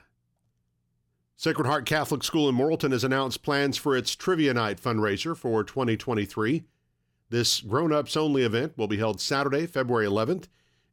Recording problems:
none

